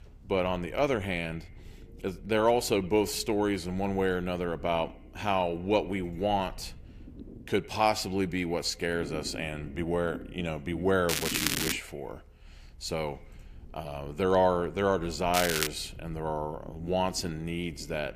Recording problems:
echo of what is said; faint; throughout; 100 ms later, 25 dB below the speech
crackling; loud; at 11 s and at 15 s; 1 dB below the speech
low rumble; faint; throughout; 25 dB below the speech

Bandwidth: 15 kHz